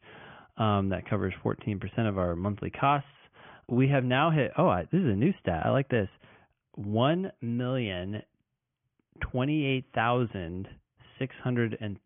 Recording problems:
high frequencies cut off; severe; nothing above 3.5 kHz

